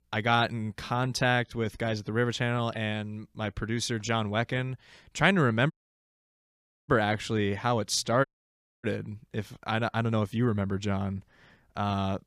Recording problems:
audio cutting out; at 5.5 s for 1 s and at 8.5 s for 0.5 s

